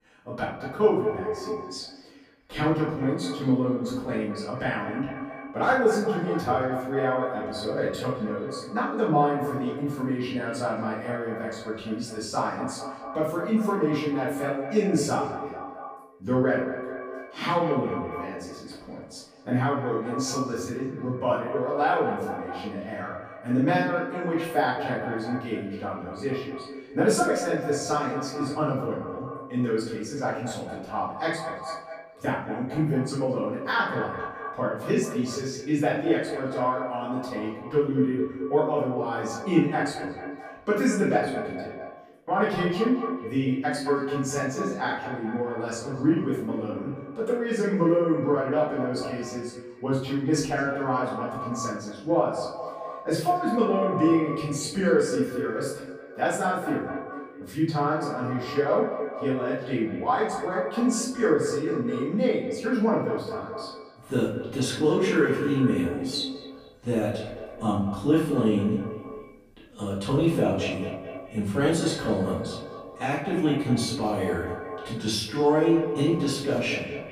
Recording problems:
echo of what is said; strong; throughout; 220 ms later, 8 dB below the speech
off-mic speech; far
room echo; noticeable; dies away in 0.5 s

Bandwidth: 15 kHz